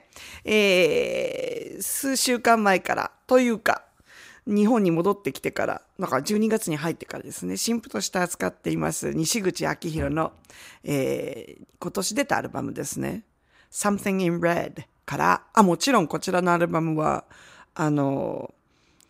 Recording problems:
none

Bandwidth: 15.5 kHz